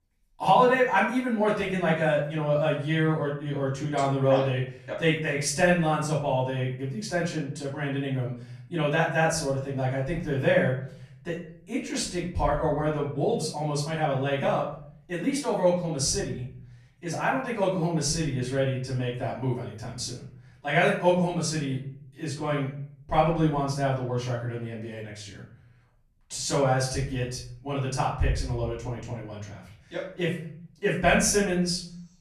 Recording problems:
off-mic speech; far
room echo; noticeable; dies away in 0.6 s

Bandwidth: 14.5 kHz